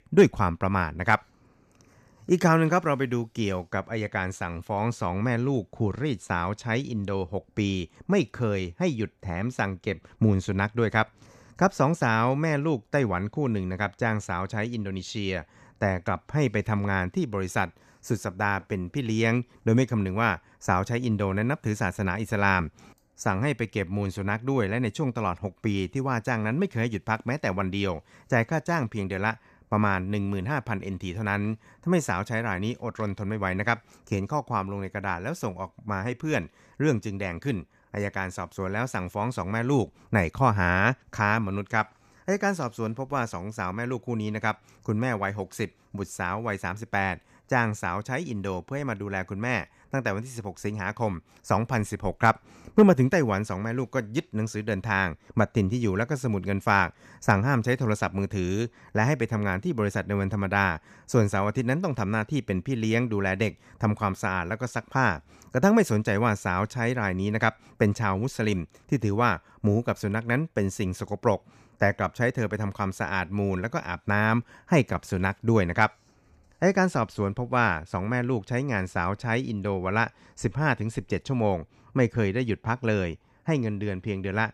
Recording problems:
none

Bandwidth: 14.5 kHz